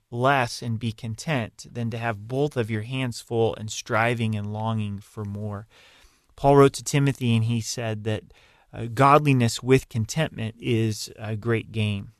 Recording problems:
none

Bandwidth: 13.5 kHz